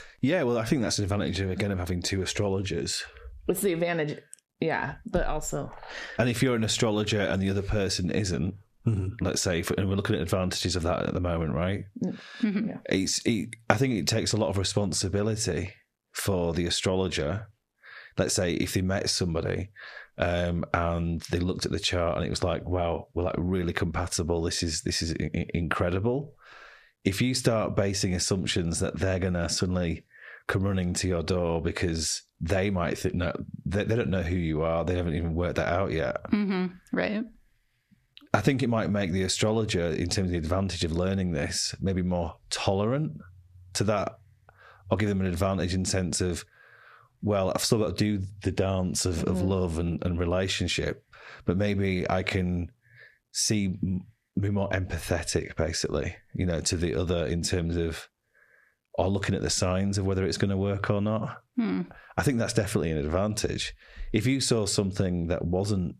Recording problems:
squashed, flat; heavily

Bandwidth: 14.5 kHz